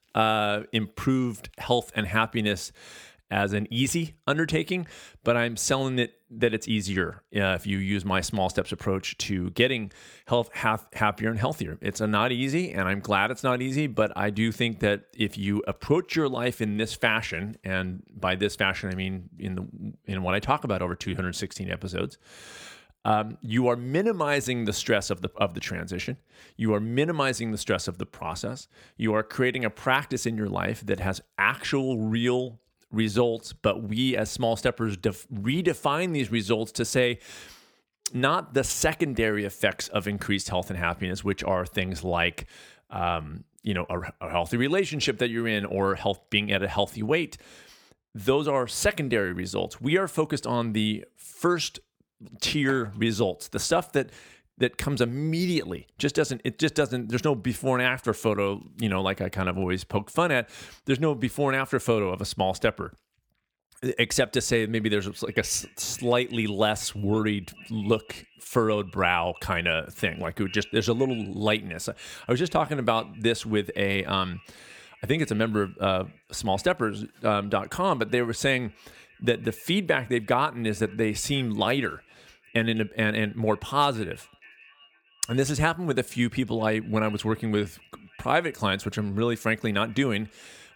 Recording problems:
echo of what is said; faint; from 1:05 on; 480 ms later, 25 dB below the speech

